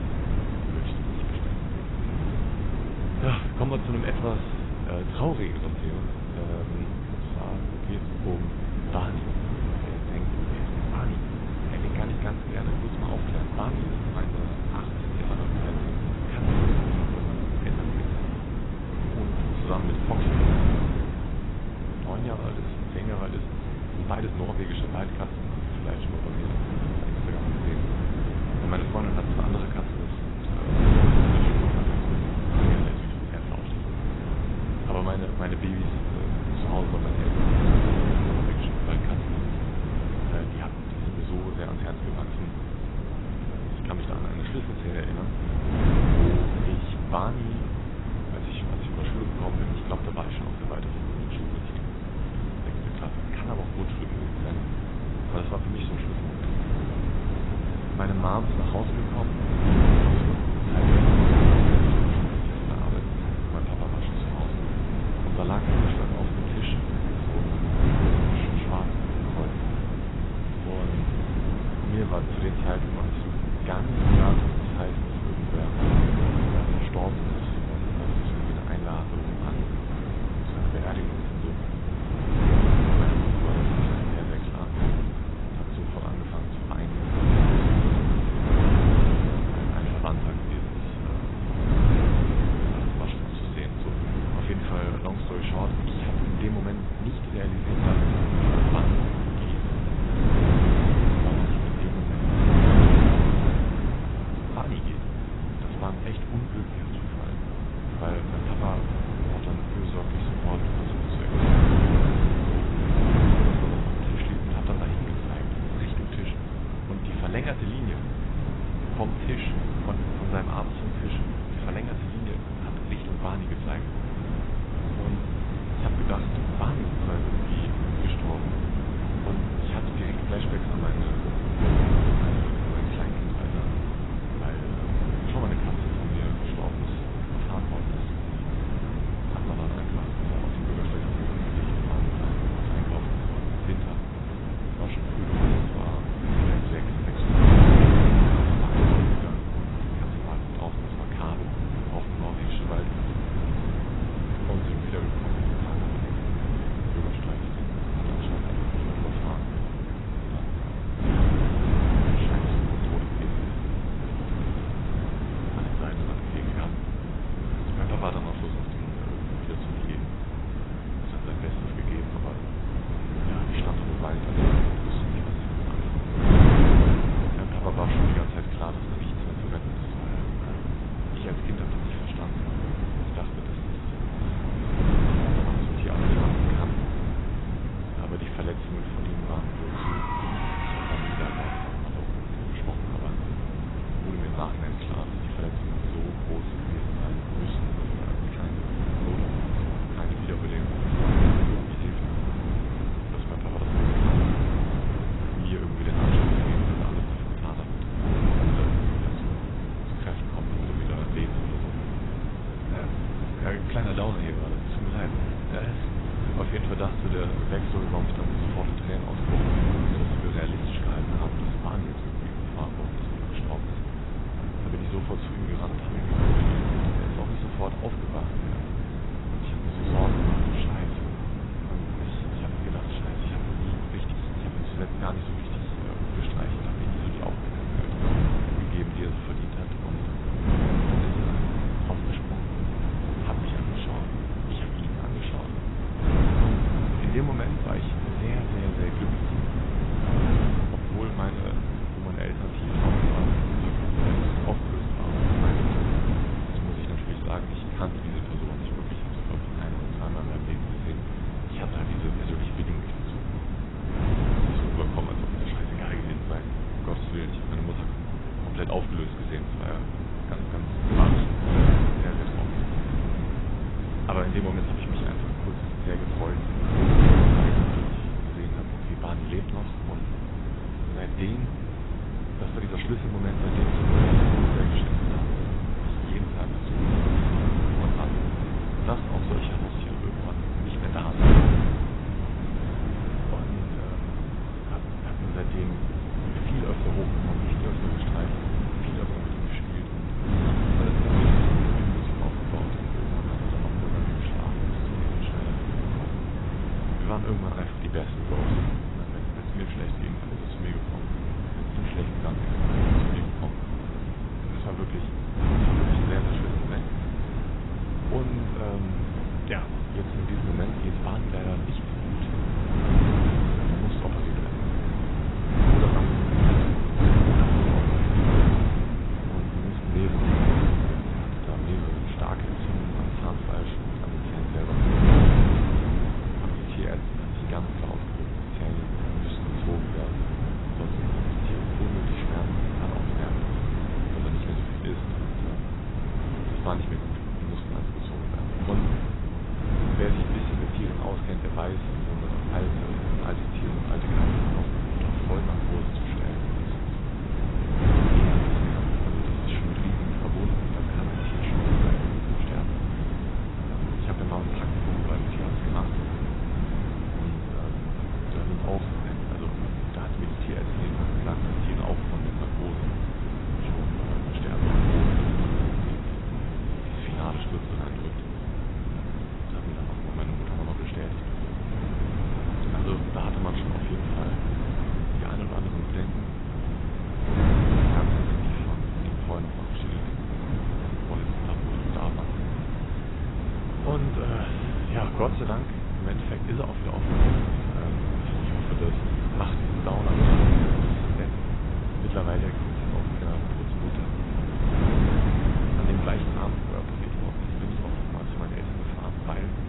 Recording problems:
garbled, watery; badly; nothing above 4 kHz
wind noise on the microphone; heavy; 5 dB above the speech
traffic noise; noticeable; throughout; 15 dB below the speech

